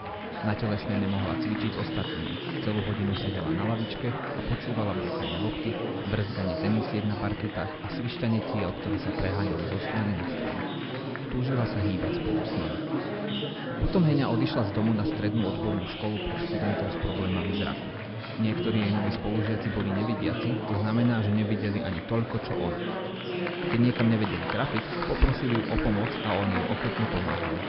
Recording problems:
high frequencies cut off; noticeable; nothing above 5 kHz
chatter from many people; loud; throughout; 2 dB below the speech

